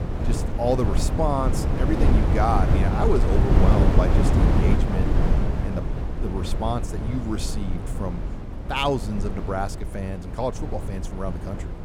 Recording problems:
wind noise on the microphone; heavy; 3 dB below the speech

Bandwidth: 18 kHz